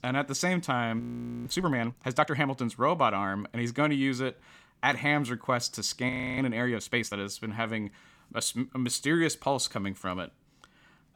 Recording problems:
audio freezing; at 1 s and at 6 s

